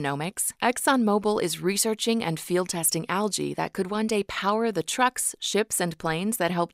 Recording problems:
abrupt cut into speech; at the start

